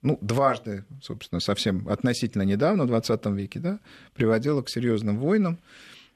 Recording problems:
none

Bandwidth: 13.5 kHz